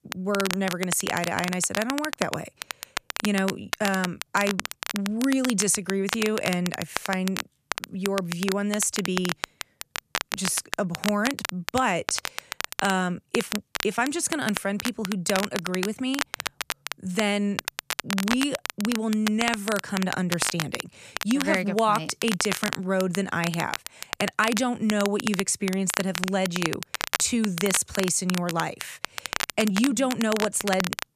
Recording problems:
crackle, like an old record; loud; 5 dB below the speech

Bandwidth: 14.5 kHz